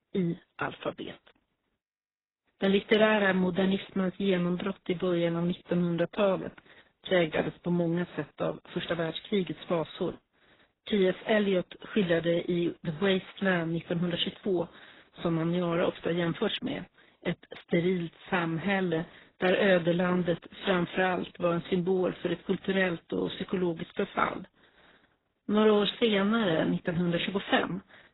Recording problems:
garbled, watery; badly; nothing above 4 kHz

